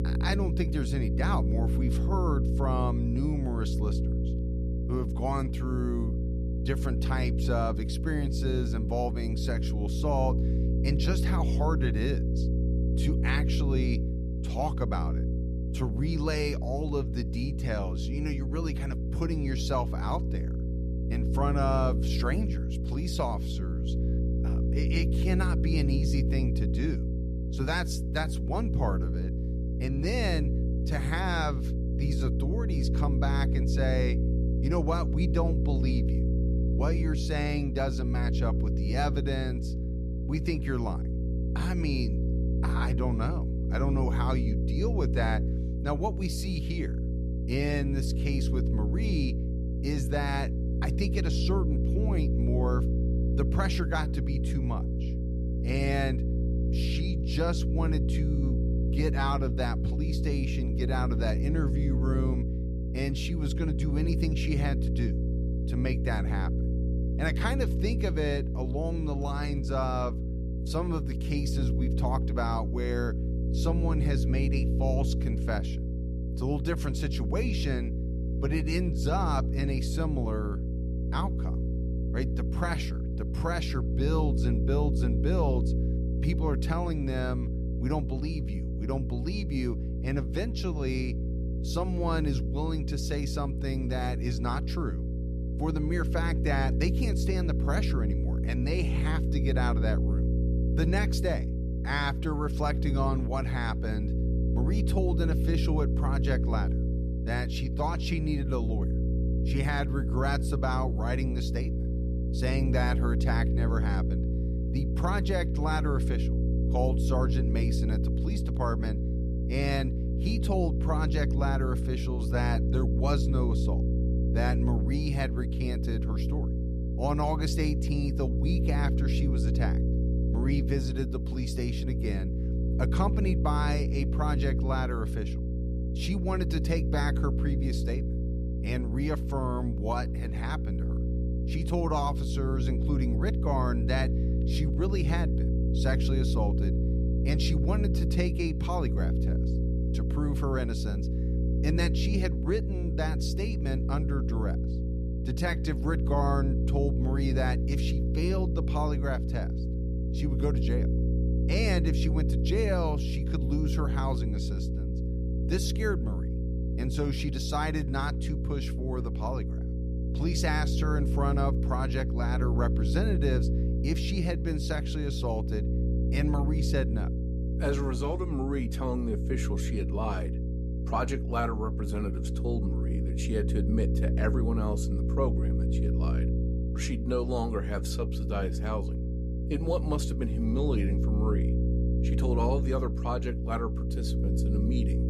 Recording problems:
electrical hum; loud; throughout; 60 Hz, 5 dB below the speech

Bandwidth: 14.5 kHz